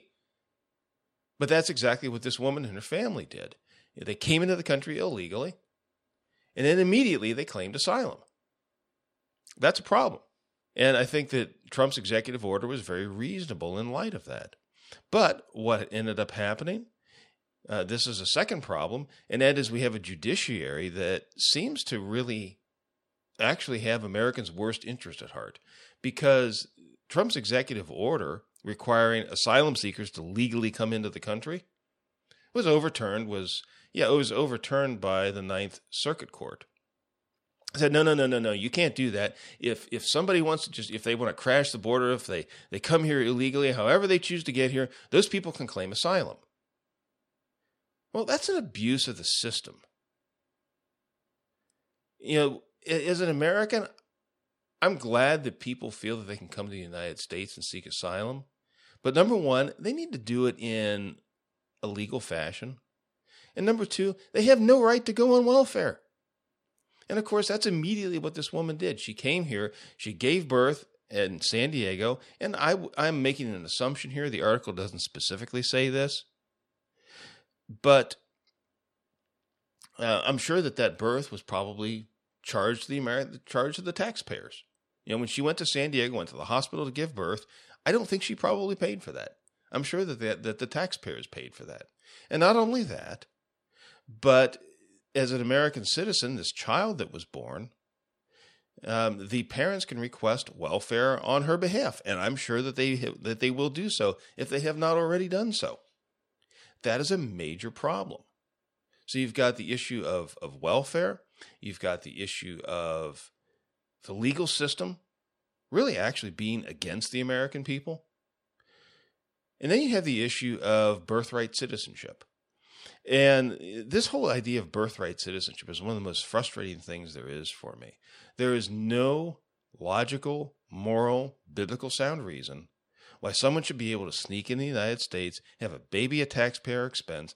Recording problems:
none

